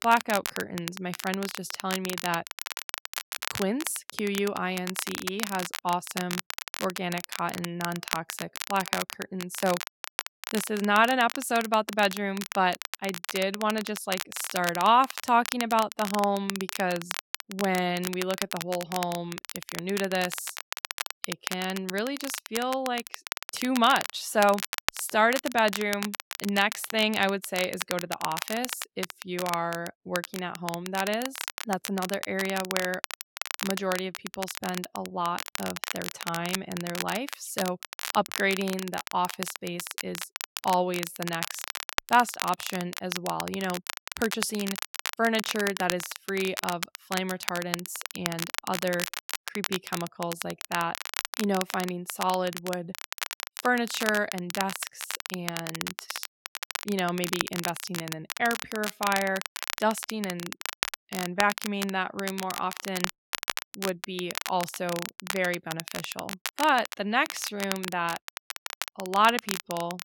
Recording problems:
crackle, like an old record; loud; 6 dB below the speech

